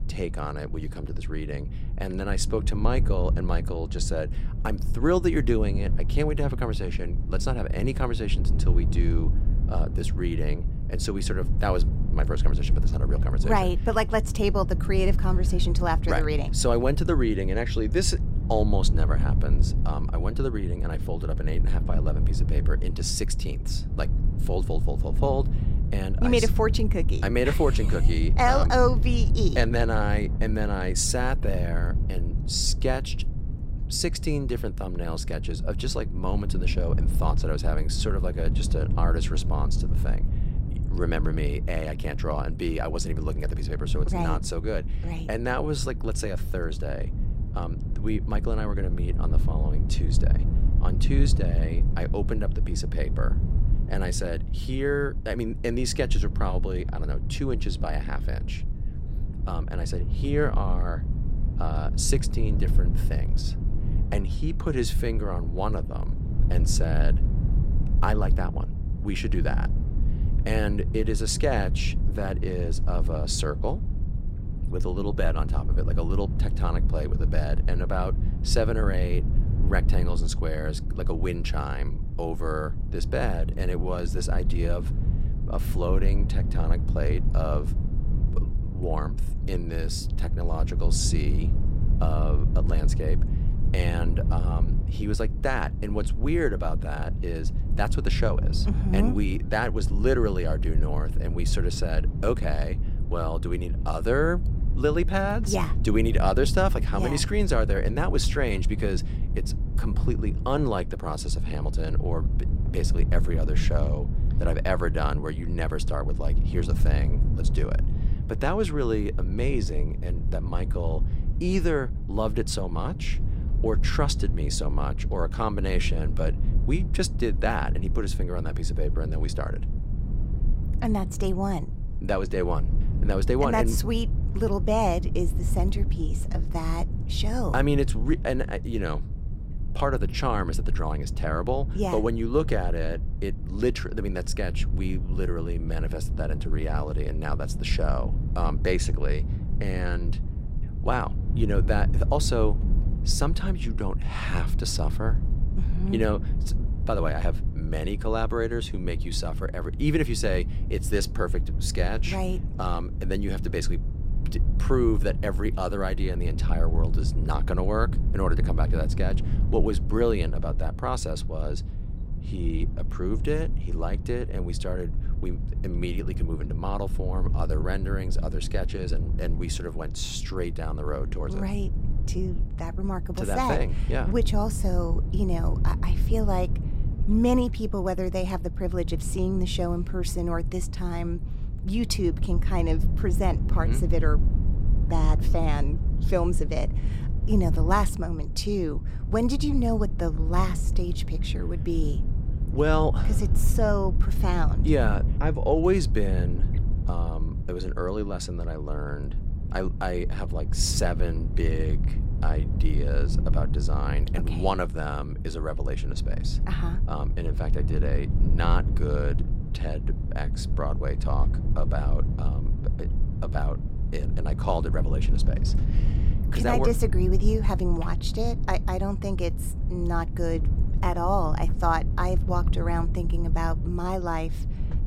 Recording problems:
low rumble; noticeable; throughout; 10 dB below the speech

